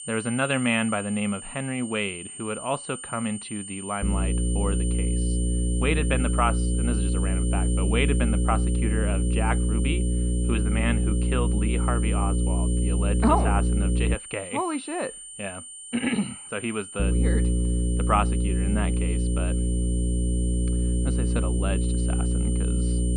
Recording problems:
muffled; slightly; fading above 3.5 kHz
electrical hum; loud; from 4 to 14 s and from 17 s on; 60 Hz, 6 dB below the speech
high-pitched whine; loud; throughout; 9 kHz, 7 dB below the speech

